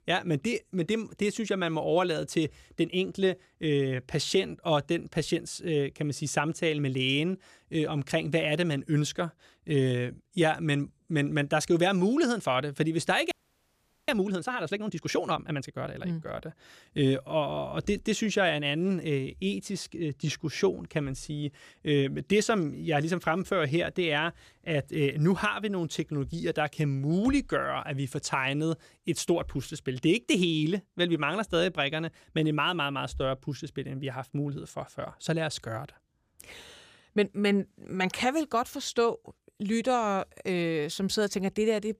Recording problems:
audio freezing; at 13 s for 1 s

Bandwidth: 15 kHz